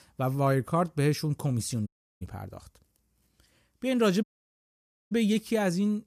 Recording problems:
audio cutting out; at 2 s and at 4 s for 1 s

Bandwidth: 14.5 kHz